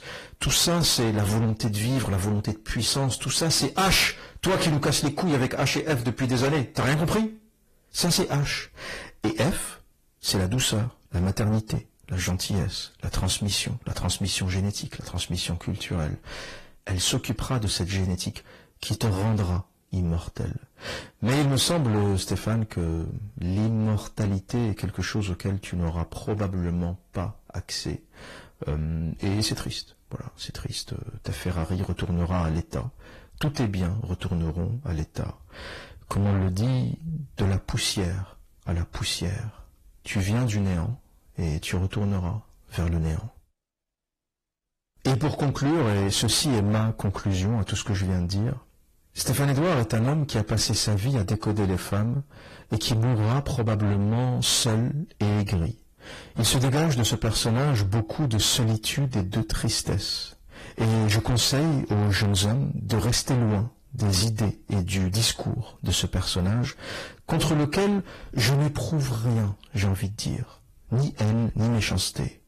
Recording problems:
distortion; heavy; 6 dB below the speech
garbled, watery; slightly; nothing above 14.5 kHz

